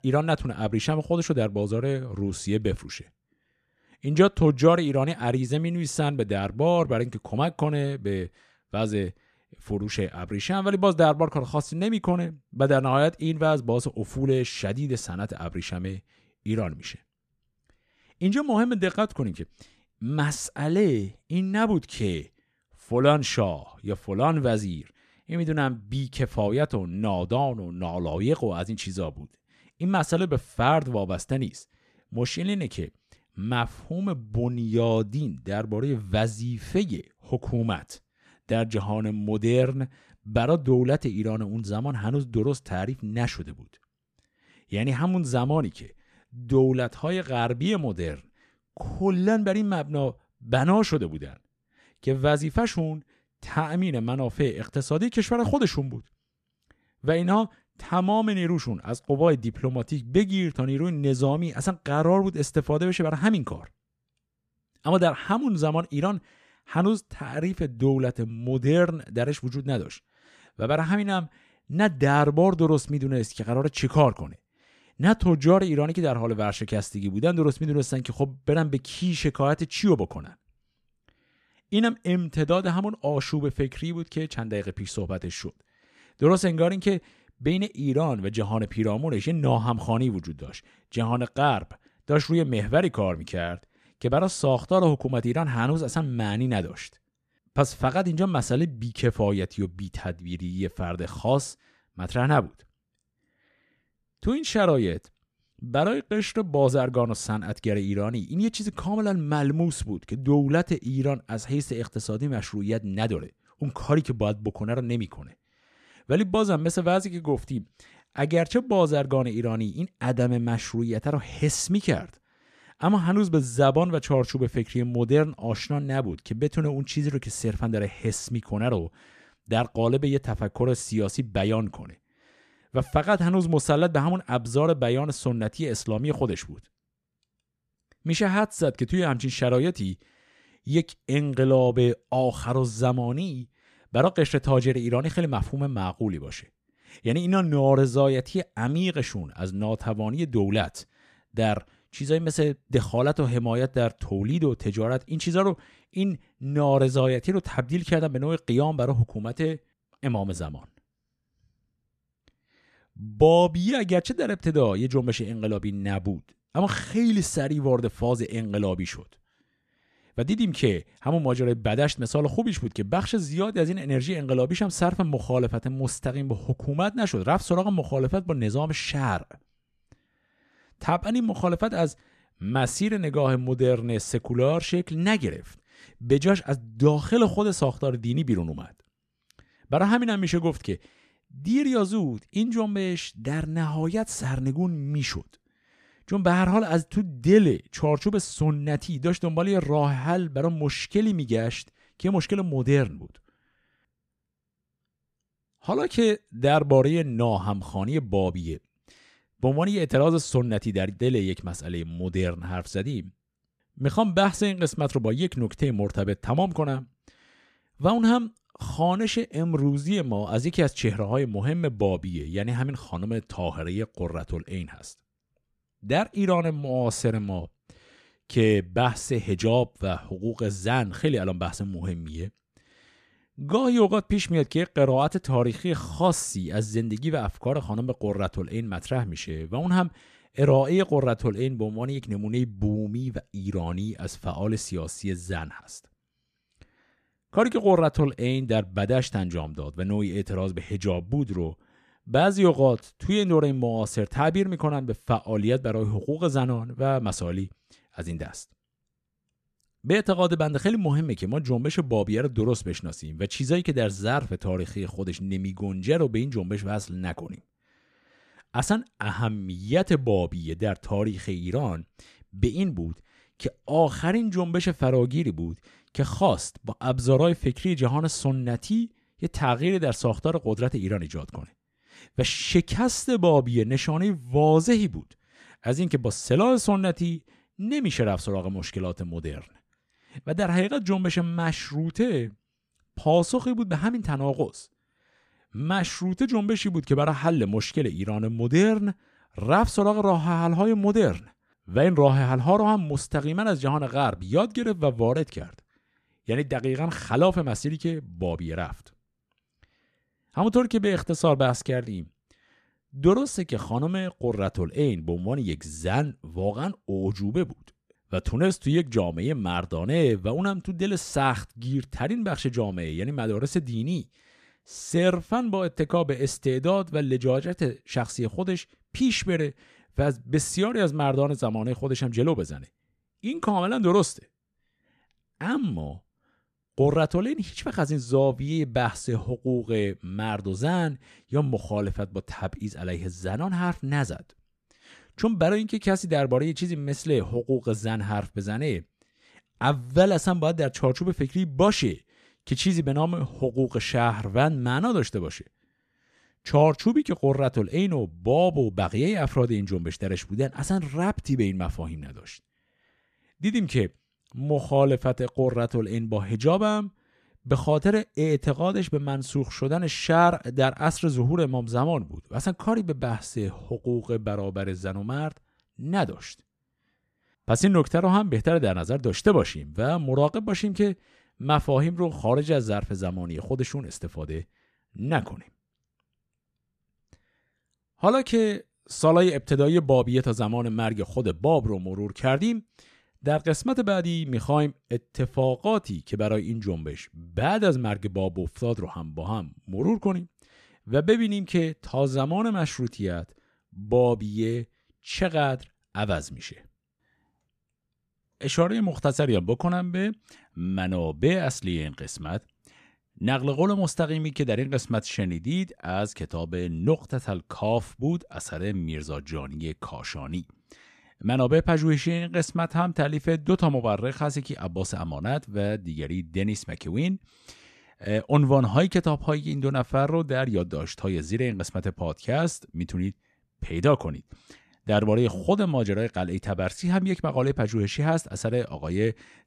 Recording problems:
none

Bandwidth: 14.5 kHz